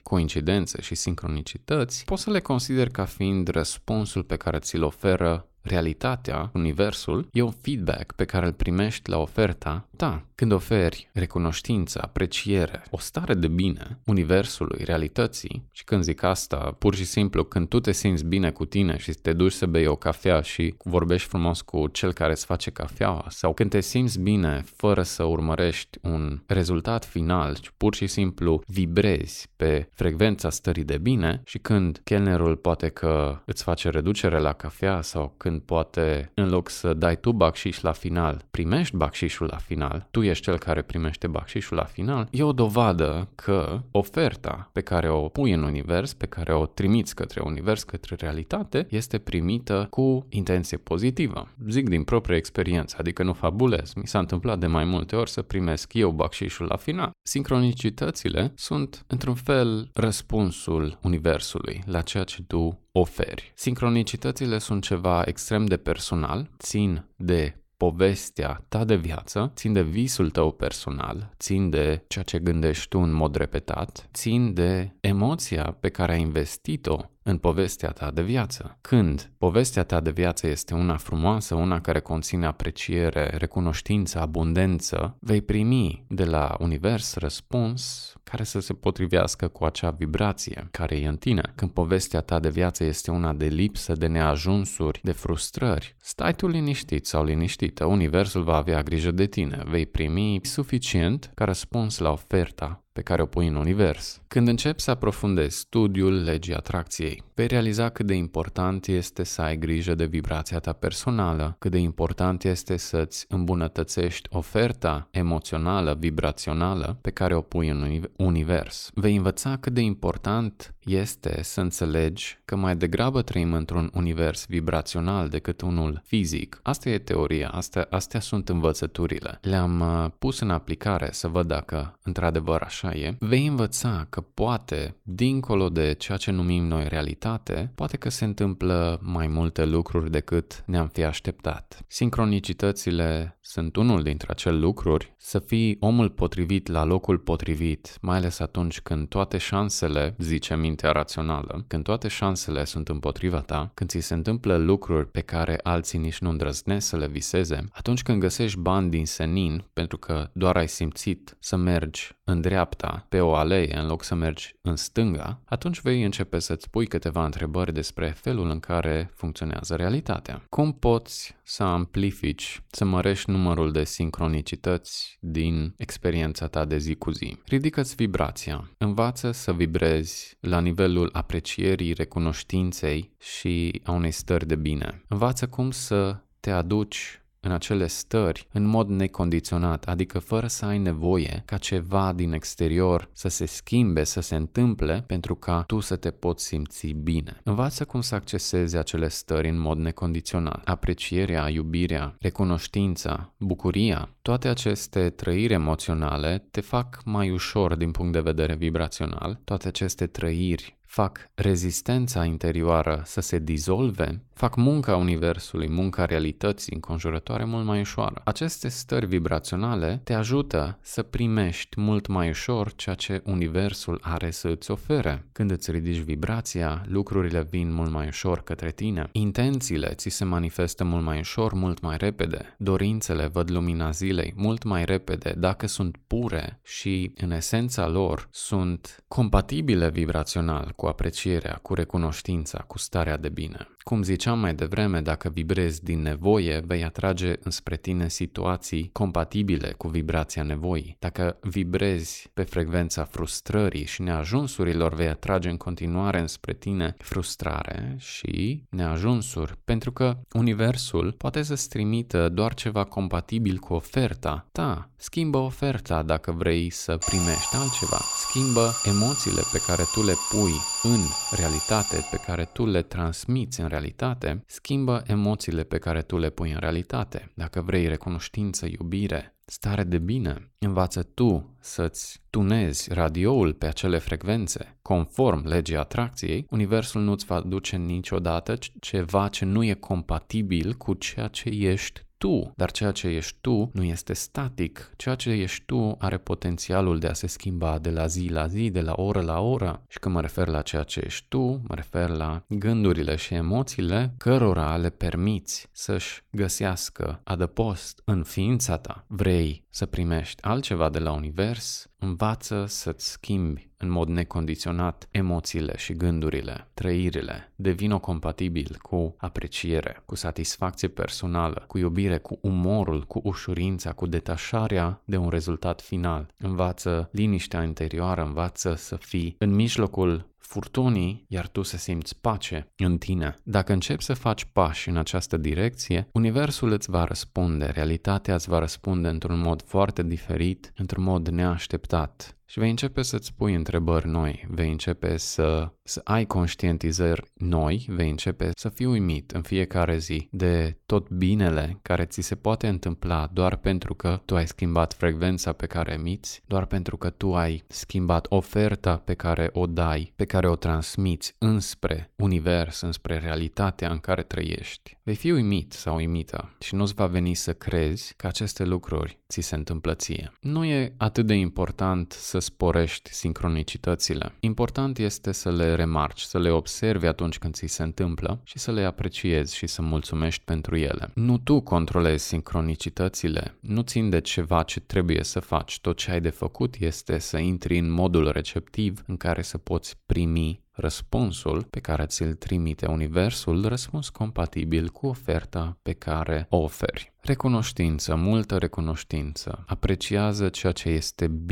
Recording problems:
alarm; loud; from 4:27 to 4:32; peak 1 dB above the speech
abrupt cut into speech; at the end

